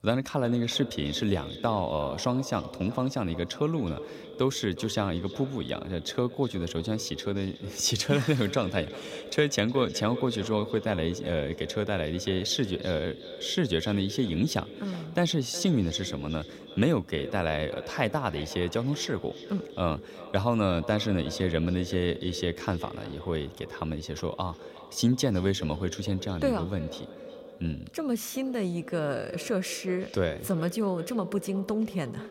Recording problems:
echo of what is said; noticeable; throughout; 370 ms later, 15 dB below the speech

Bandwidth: 16 kHz